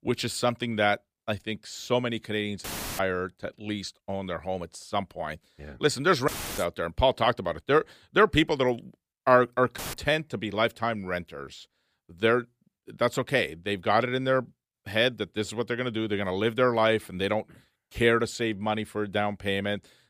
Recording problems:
audio cutting out; filled with static; at 2.5 s, at 6.5 s and at 10 s

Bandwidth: 15 kHz